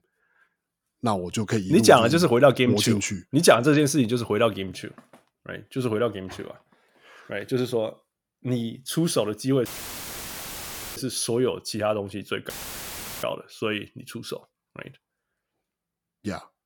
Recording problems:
audio cutting out; filled with static; at 9.5 s for 1.5 s and at 13 s for 0.5 s

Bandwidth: 18 kHz